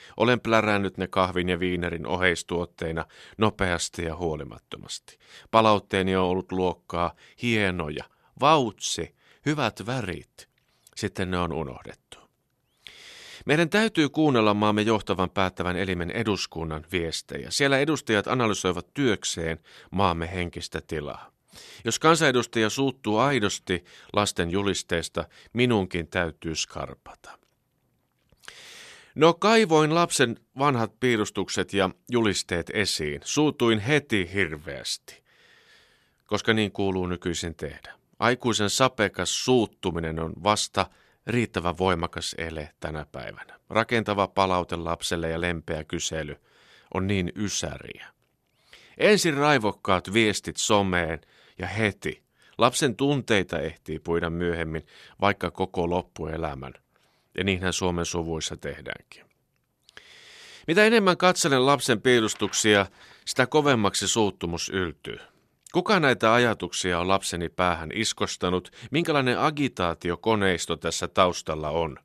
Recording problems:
none

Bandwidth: 13.5 kHz